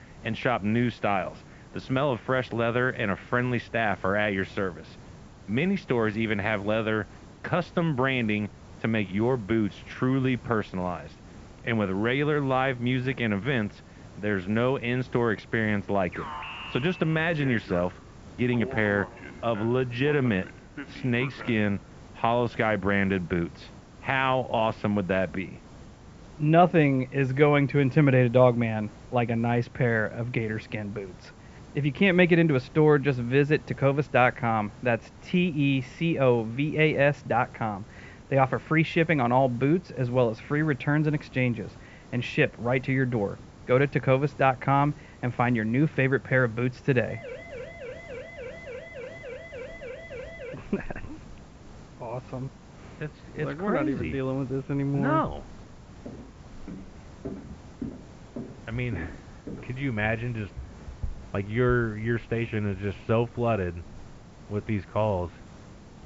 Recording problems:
muffled; very slightly; fading above 2.5 kHz
high frequencies cut off; slight; nothing above 7.5 kHz
hiss; faint; throughout; 20 dB below the speech
alarm; noticeable; from 16 to 22 s; peak 10 dB below the speech
siren; faint; from 47 to 51 s; peak 15 dB below the speech
footsteps; faint; from 56 s to 1:01; peak 15 dB below the speech

